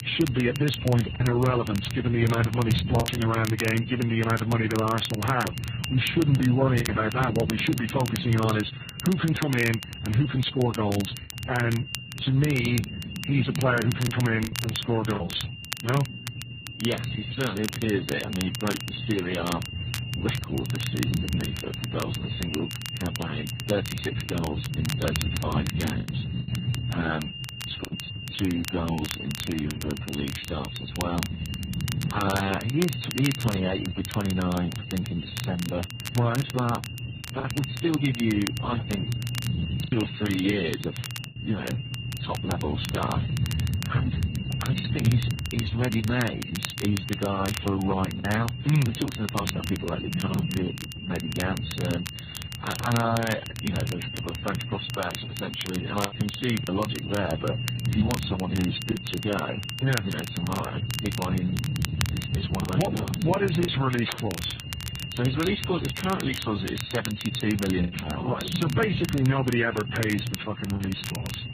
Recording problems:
garbled, watery; badly; nothing above 4 kHz
high-pitched whine; loud; throughout; 3 kHz, 8 dB below the speech
low rumble; noticeable; throughout; 15 dB below the speech
crackle, like an old record; noticeable; 10 dB below the speech
choppy; occasionally; 2% of the speech affected

